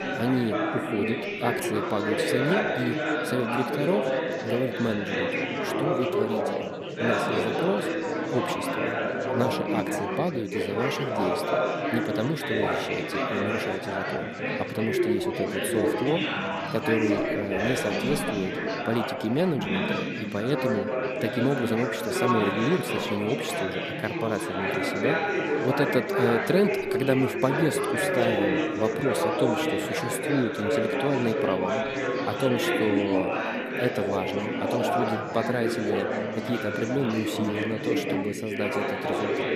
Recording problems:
chatter from many people; very loud; throughout; 2 dB above the speech

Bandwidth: 14.5 kHz